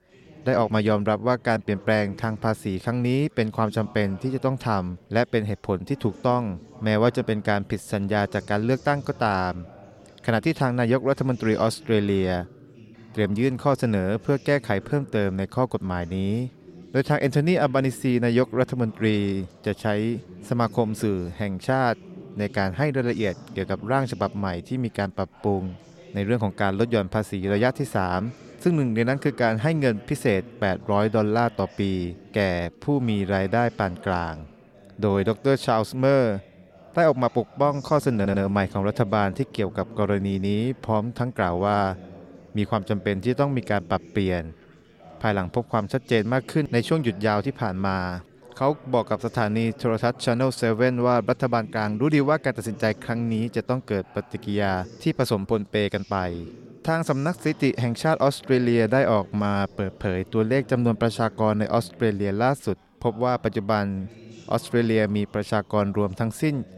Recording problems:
chatter from many people; faint; throughout; 20 dB below the speech
audio stuttering; at 38 s

